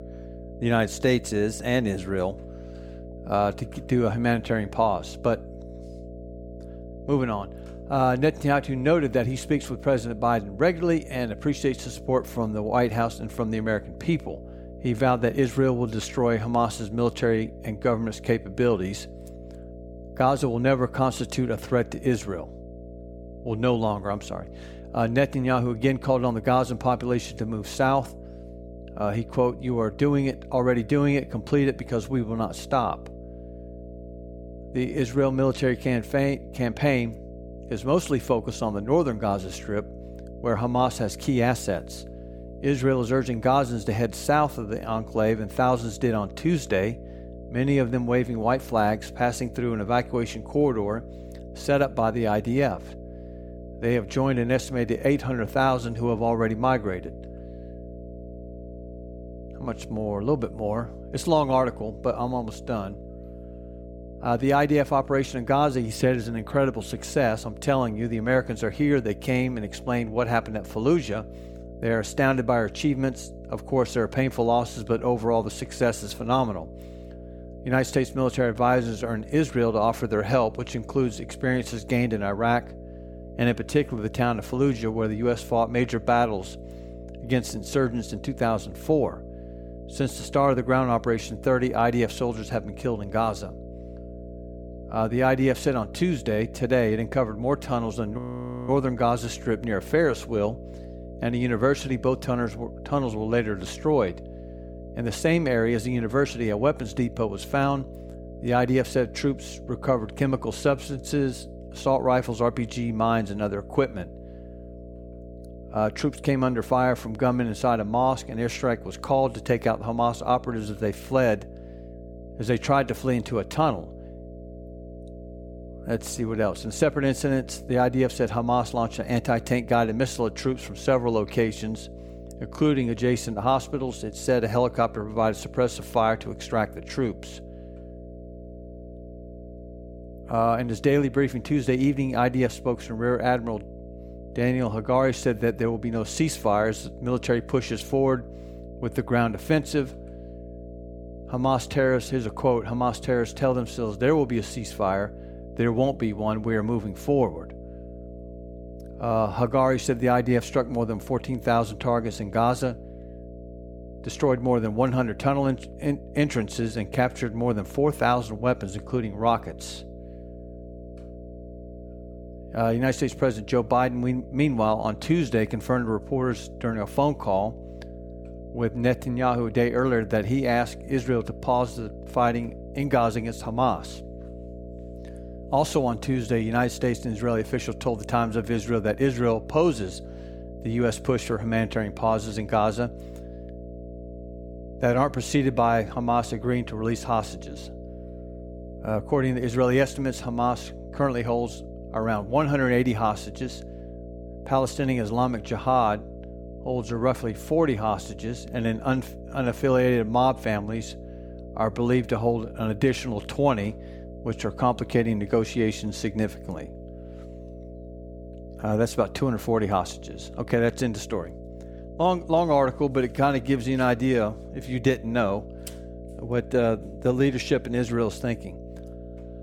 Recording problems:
electrical hum; noticeable; throughout; 60 Hz, 20 dB below the speech
audio freezing; at 1:38 for 0.5 s

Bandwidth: 17.5 kHz